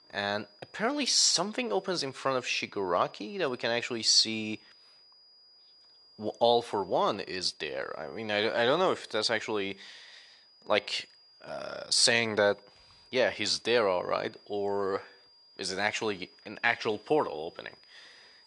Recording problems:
thin; very slightly; fading below 1 kHz
high-pitched whine; faint; throughout; 5 kHz, 30 dB below the speech

